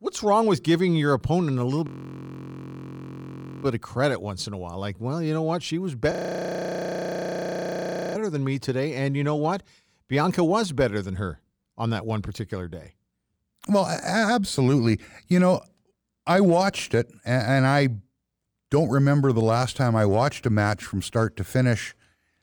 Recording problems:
audio freezing; at 2 s for 2 s and at 6 s for 2 s

